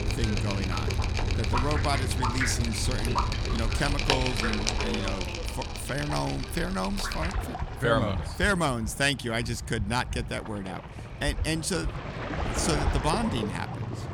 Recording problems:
rain or running water; loud; throughout; 1 dB below the speech

